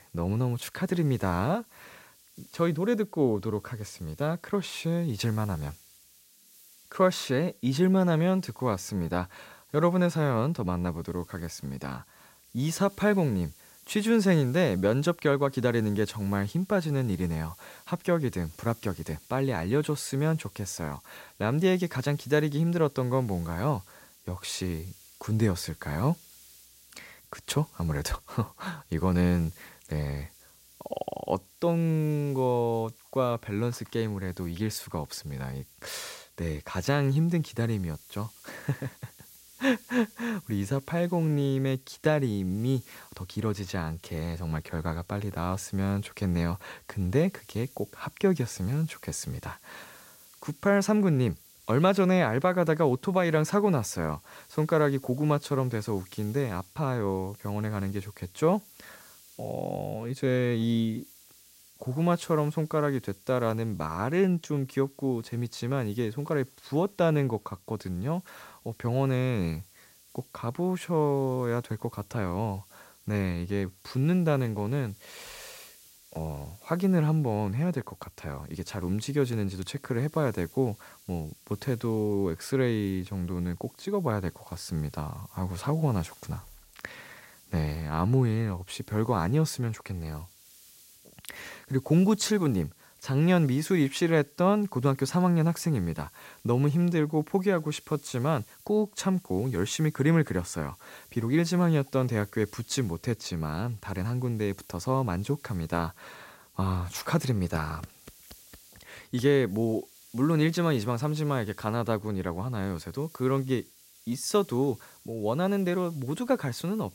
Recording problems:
hiss; faint; throughout; 25 dB below the speech

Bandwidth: 16 kHz